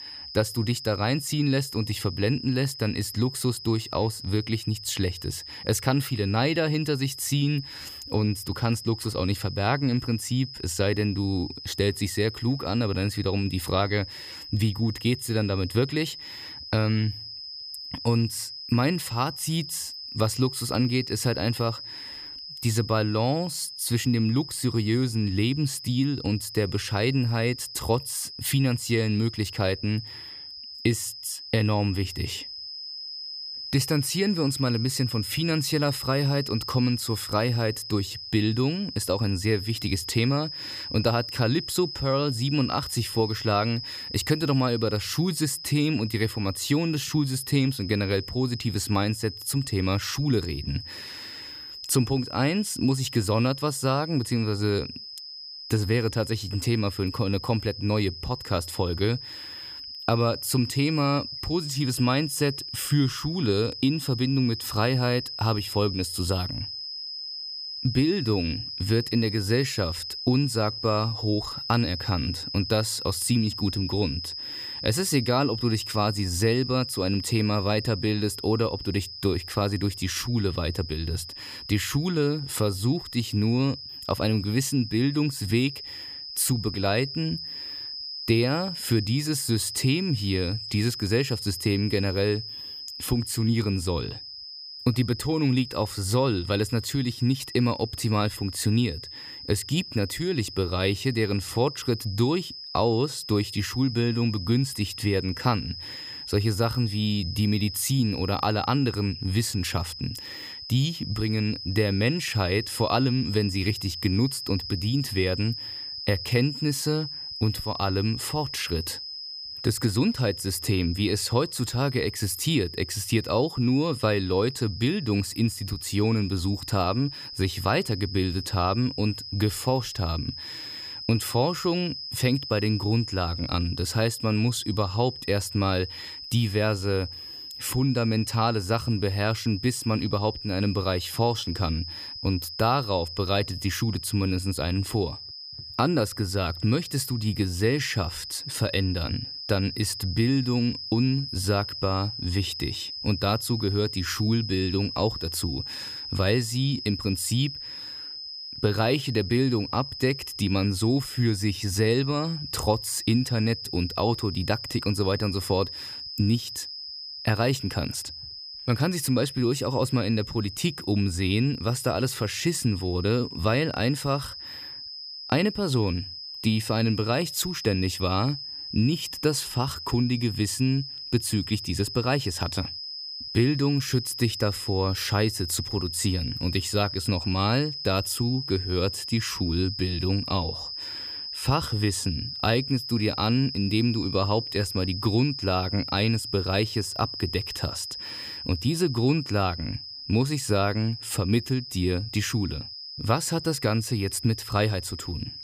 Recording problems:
high-pitched whine; loud; throughout; 5 kHz, 8 dB below the speech

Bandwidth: 15 kHz